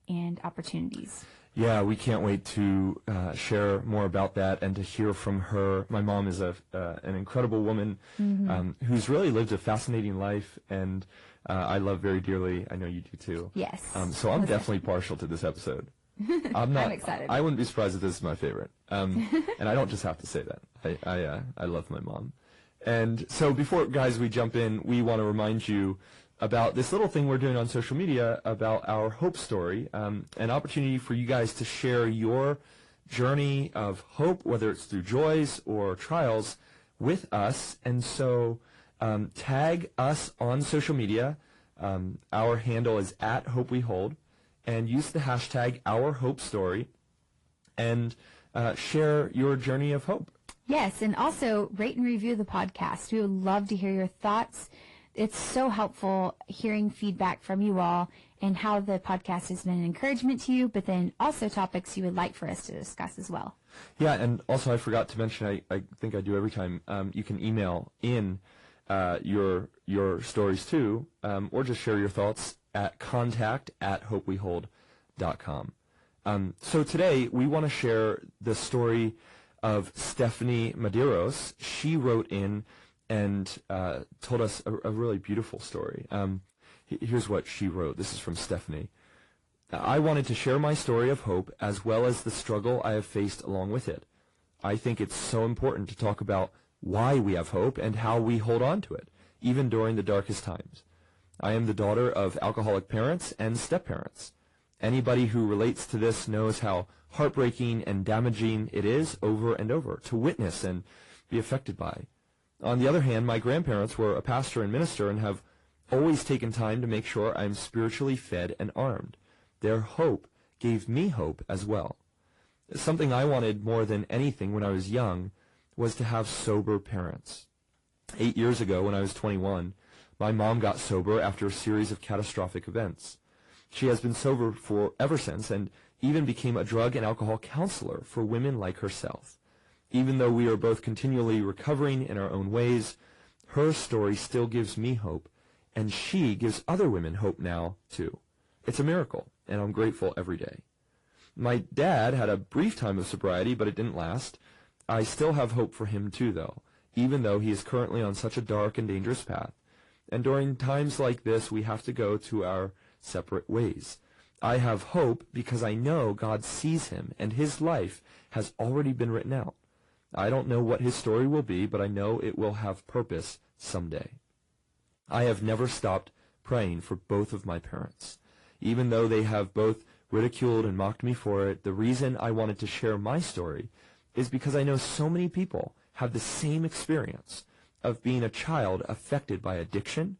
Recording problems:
distortion; slight; 10 dB below the speech
garbled, watery; slightly

